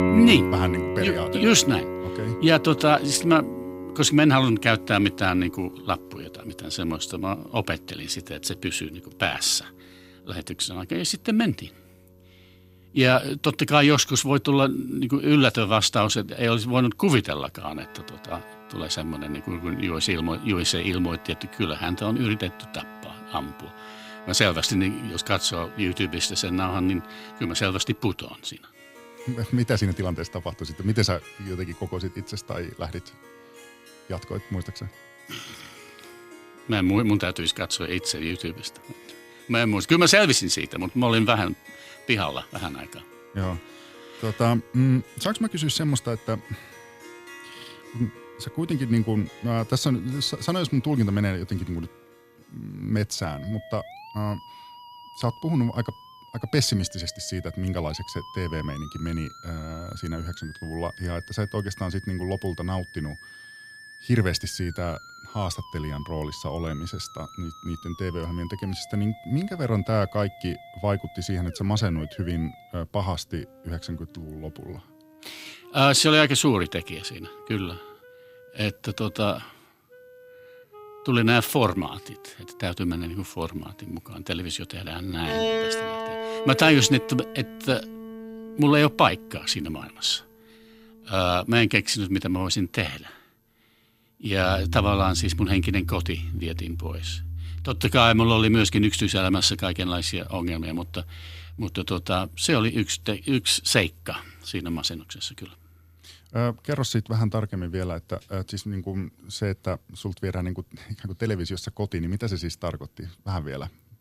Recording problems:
background music; noticeable; throughout; 15 dB below the speech

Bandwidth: 15.5 kHz